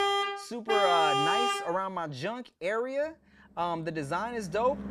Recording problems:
traffic noise; very loud; throughout; 3 dB above the speech

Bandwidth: 14.5 kHz